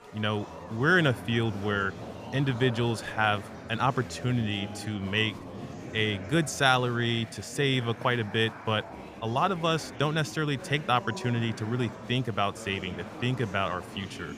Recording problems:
murmuring crowd; noticeable; throughout; 15 dB below the speech

